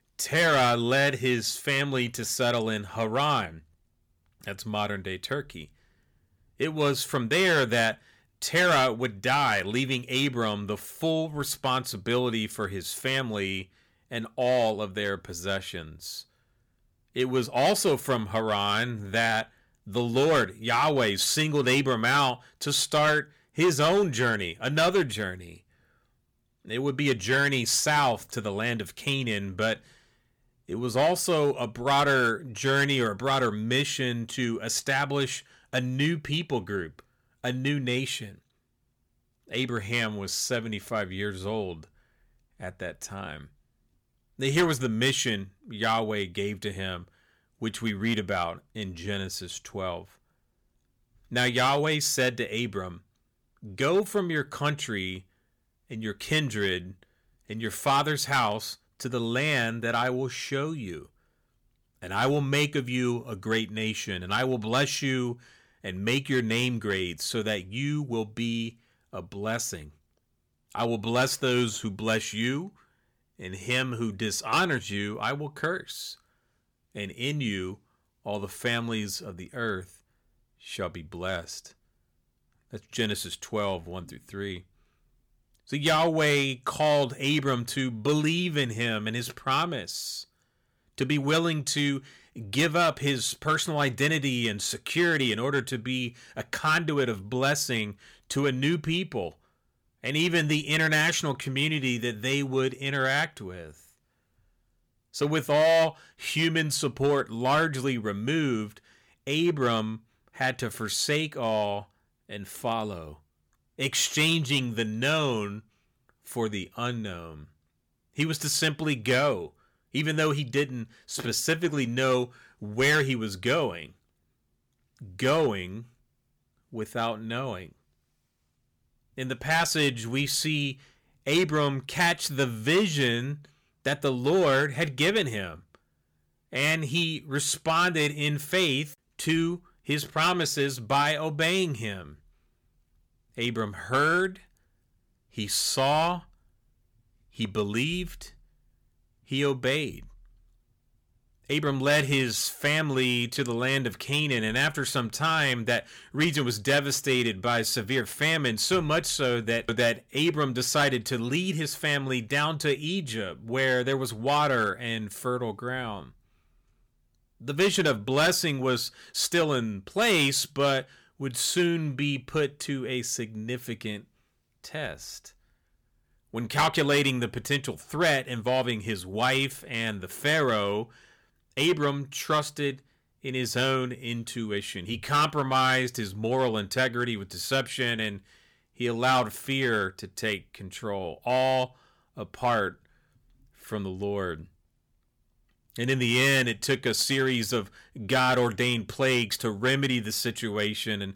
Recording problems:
distortion; slight; 3% of the sound clipped

